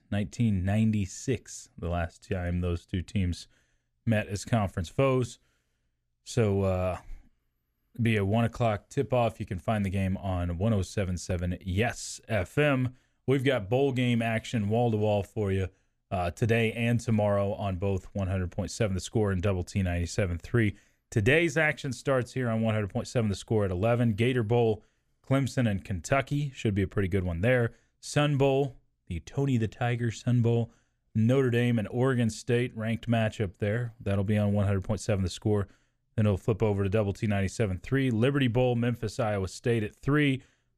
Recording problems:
none

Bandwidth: 14.5 kHz